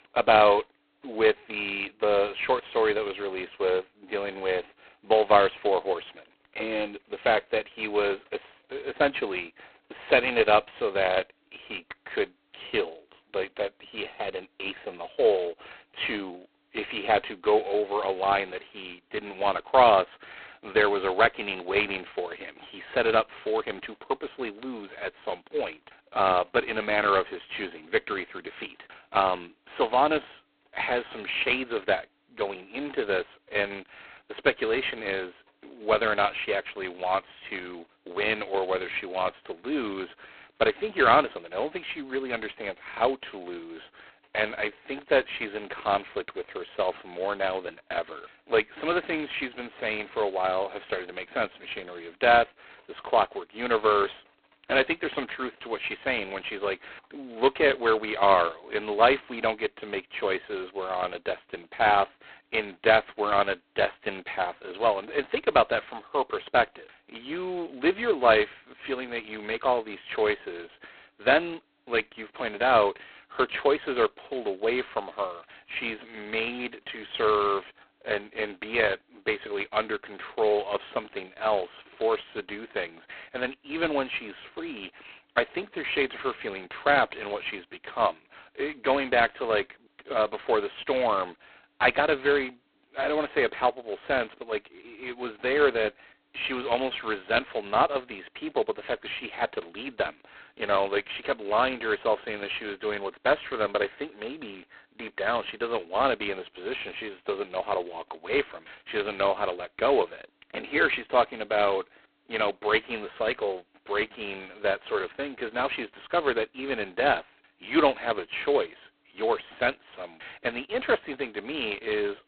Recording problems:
phone-call audio; poor line; nothing above 4 kHz

